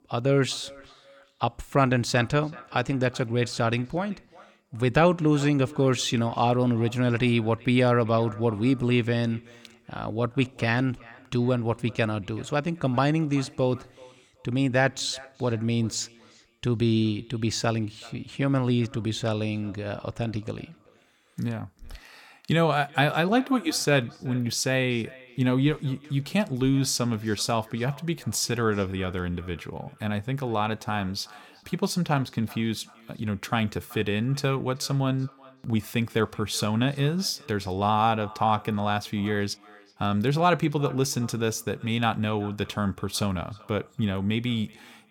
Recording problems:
echo of what is said; faint; throughout; 380 ms later, 25 dB below the speech

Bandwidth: 17.5 kHz